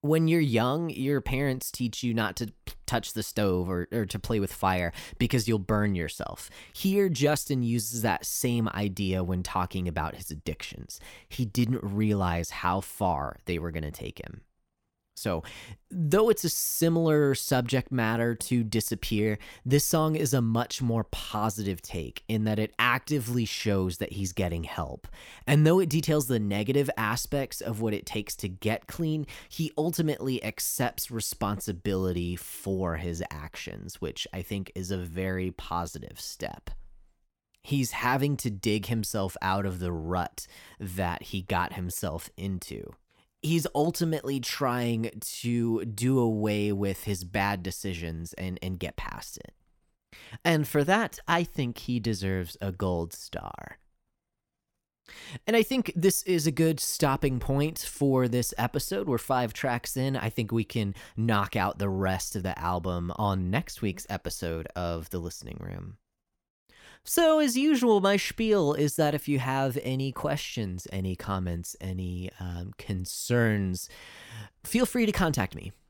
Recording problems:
none

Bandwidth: 17.5 kHz